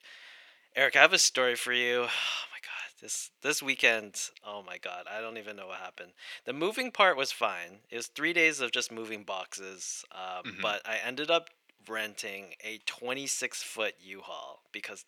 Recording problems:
thin; very; fading below 550 Hz

